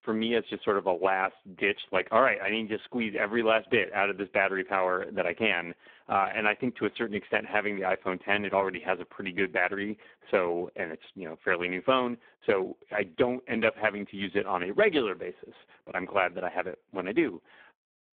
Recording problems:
phone-call audio; poor line

